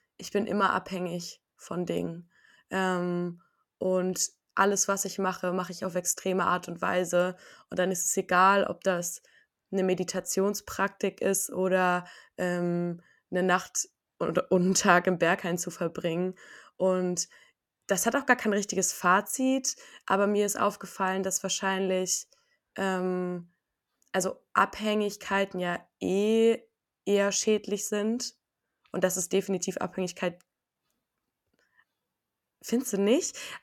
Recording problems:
none

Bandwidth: 18 kHz